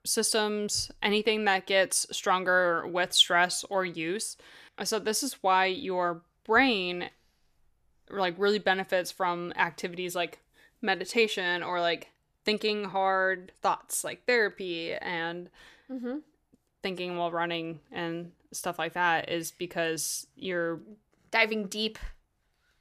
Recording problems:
none

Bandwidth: 14.5 kHz